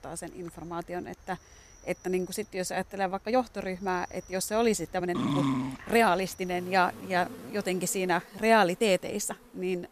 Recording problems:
animal sounds; faint; throughout; 20 dB below the speech
uneven, jittery; strongly; from 1 to 9.5 s
dog barking; loud; at 5 s; peak 1 dB above the speech

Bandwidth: 14.5 kHz